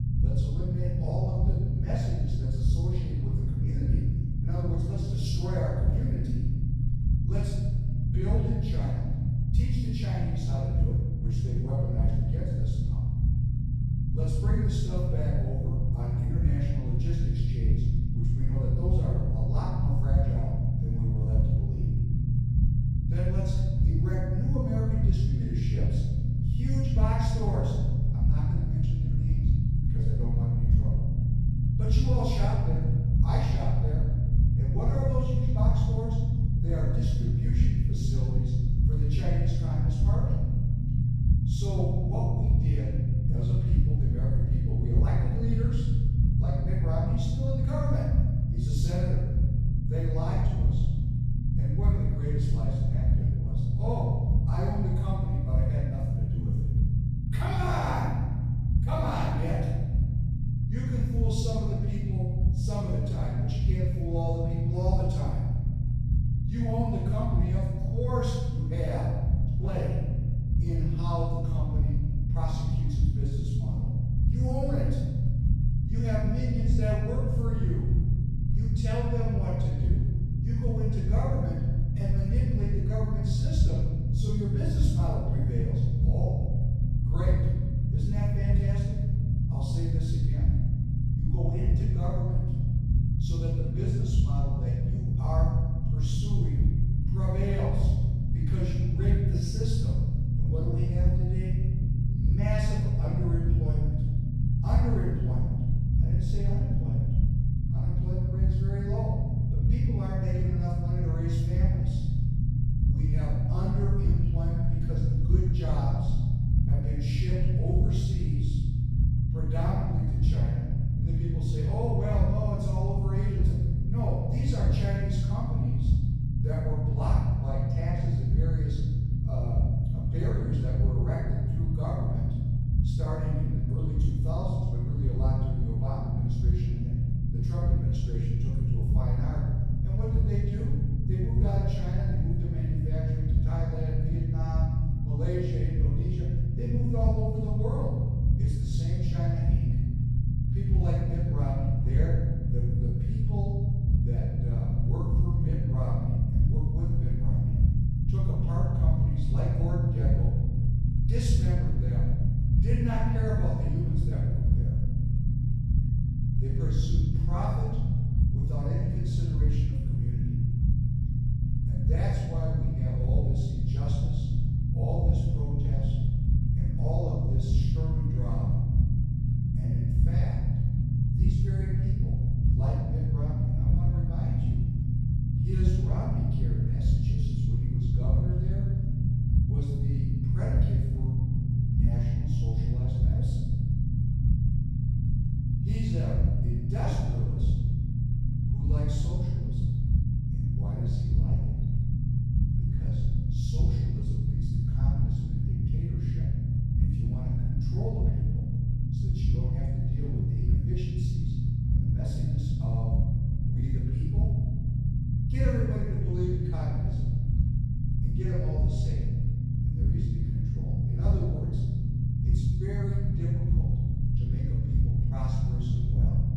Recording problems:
room echo; strong; dies away in 1.2 s
off-mic speech; far
low rumble; loud; throughout; as loud as the speech

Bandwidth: 14.5 kHz